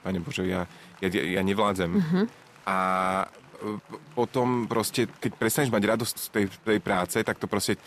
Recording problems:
chatter from many people; faint; throughout; 25 dB below the speech

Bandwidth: 14 kHz